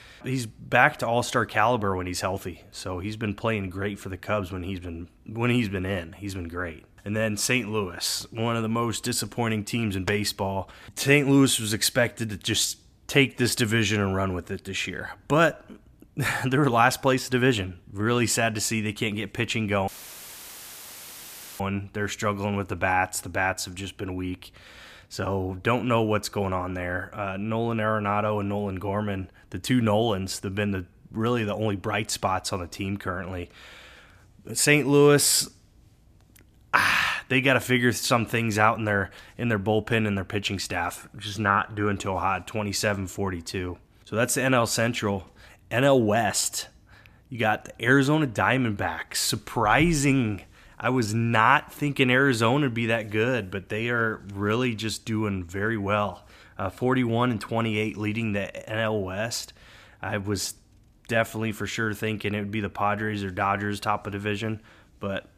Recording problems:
audio cutting out; filled with static; at 20 s for 1.5 s

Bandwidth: 14.5 kHz